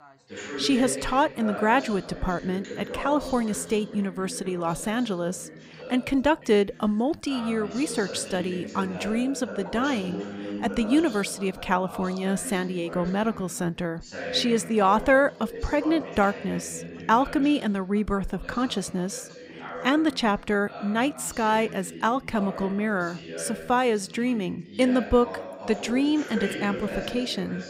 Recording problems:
background chatter; noticeable; throughout; 2 voices, 10 dB below the speech

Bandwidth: 15.5 kHz